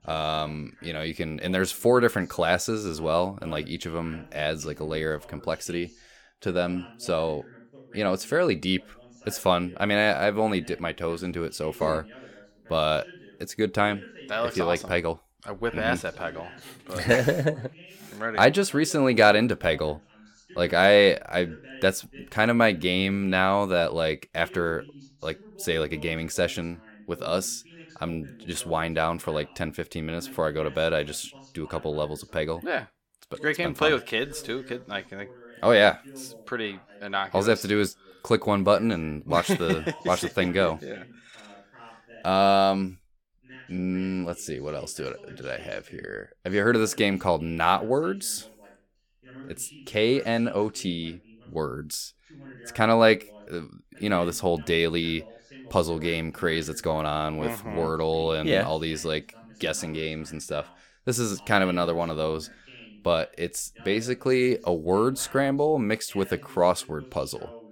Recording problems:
voice in the background; faint; throughout; 25 dB below the speech

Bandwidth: 17.5 kHz